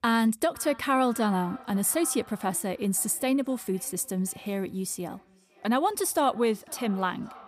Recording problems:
echo of what is said; faint; throughout; 510 ms later, 20 dB below the speech

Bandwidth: 15 kHz